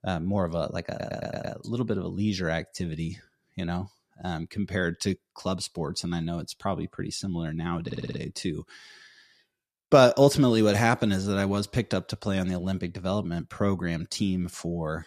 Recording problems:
audio stuttering; at 1 s and at 8 s

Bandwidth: 14.5 kHz